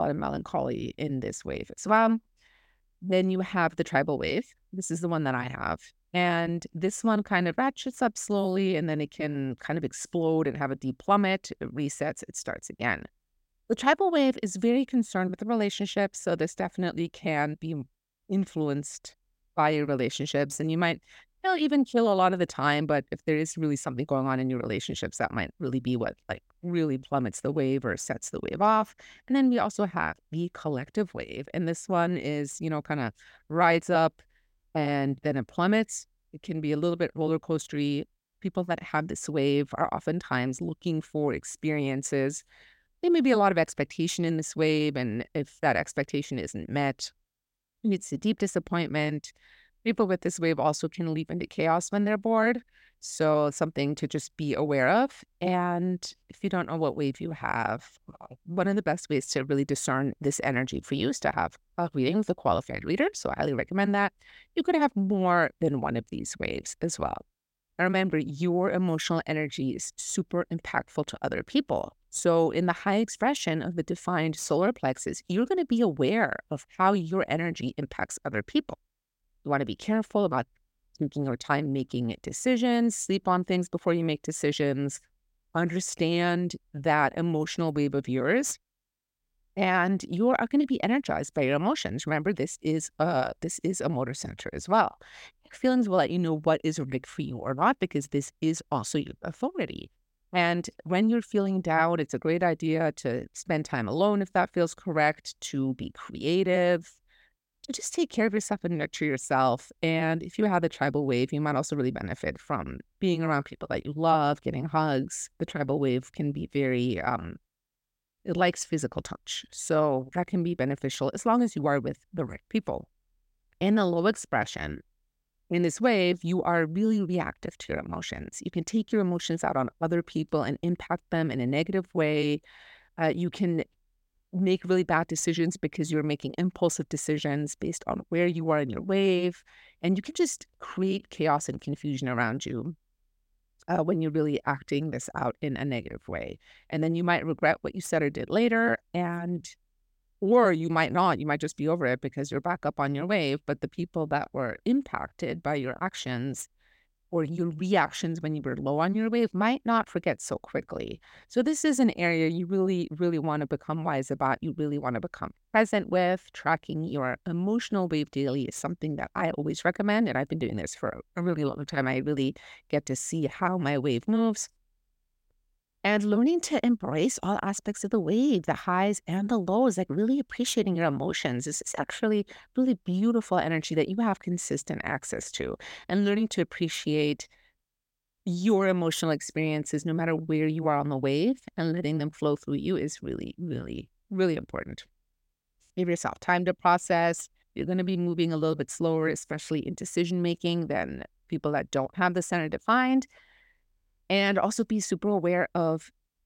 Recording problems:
abrupt cut into speech; at the start

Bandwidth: 16.5 kHz